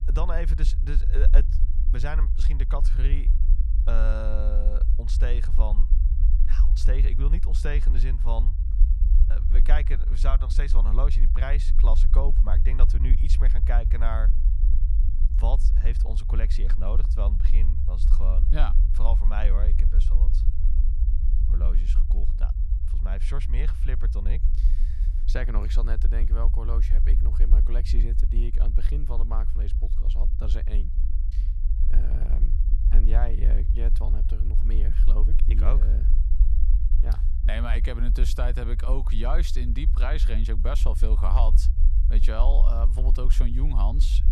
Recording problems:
low rumble; loud; throughout; 9 dB below the speech

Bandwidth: 14 kHz